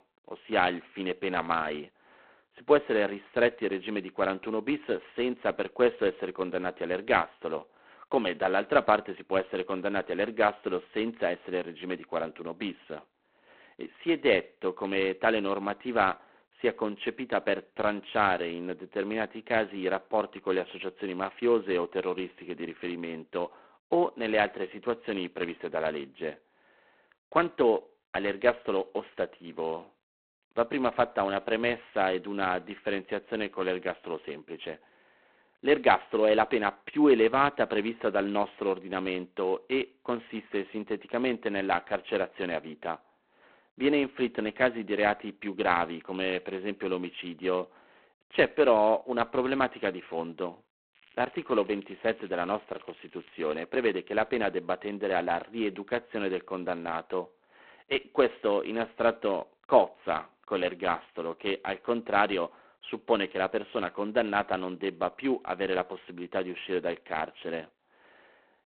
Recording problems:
phone-call audio; poor line; nothing above 4 kHz
crackling; faint; from 51 to 54 s; 25 dB below the speech

